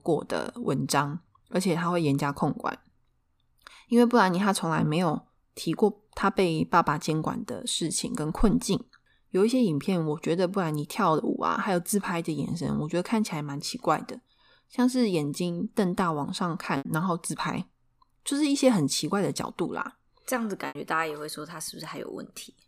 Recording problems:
choppy; occasionally; 1% of the speech affected

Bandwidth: 15 kHz